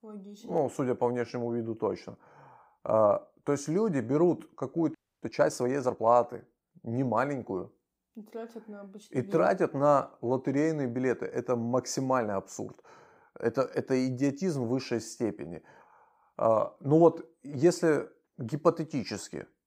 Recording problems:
audio freezing; at 5 s

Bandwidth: 15.5 kHz